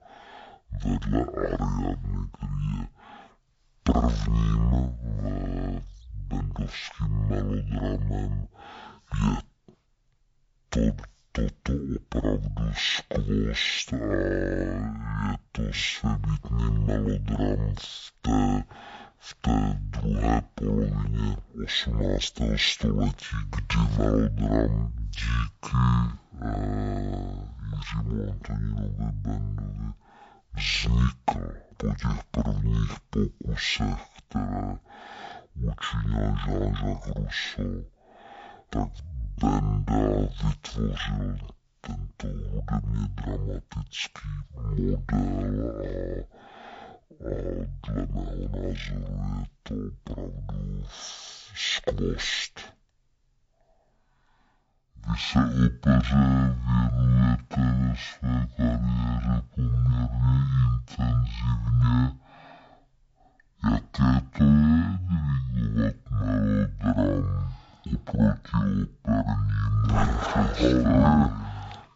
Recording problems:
wrong speed and pitch; too slow and too low; 0.5 times normal speed

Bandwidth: 7.5 kHz